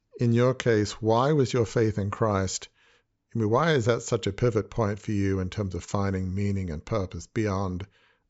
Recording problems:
high frequencies cut off; noticeable; nothing above 8 kHz

